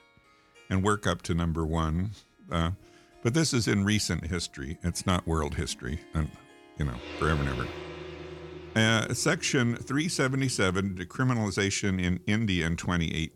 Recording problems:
background music; noticeable; throughout; 15 dB below the speech

